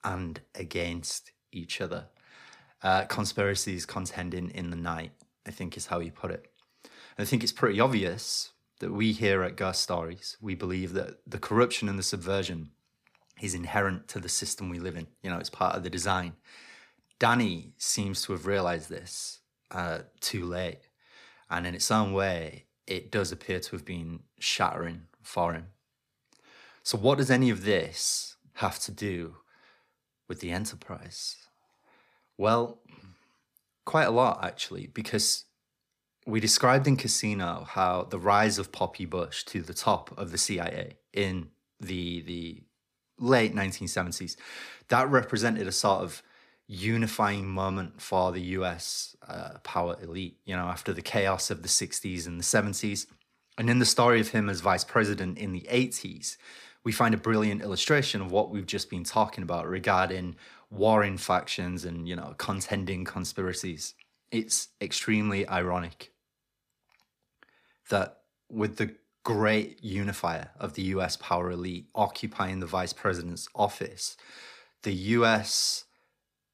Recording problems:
none

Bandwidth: 15 kHz